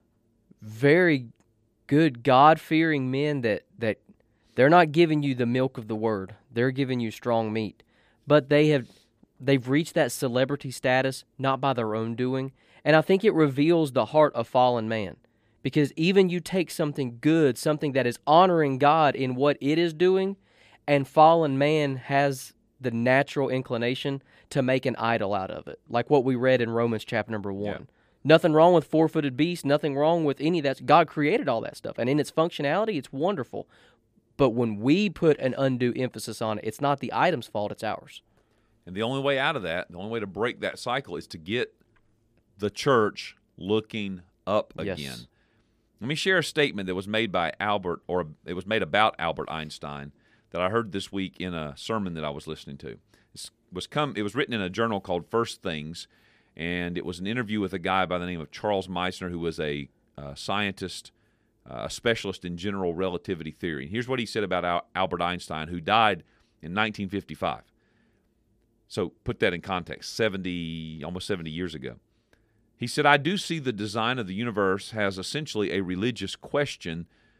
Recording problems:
none

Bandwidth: 15 kHz